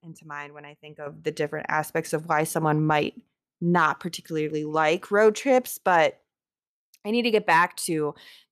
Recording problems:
none

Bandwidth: 14 kHz